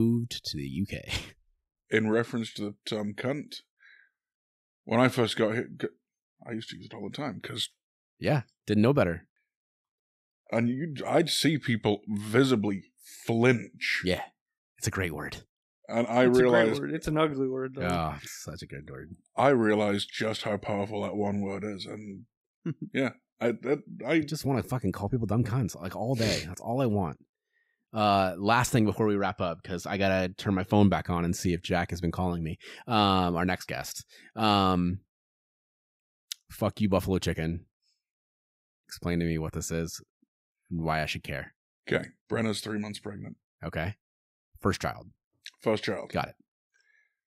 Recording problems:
abrupt cut into speech; at the start

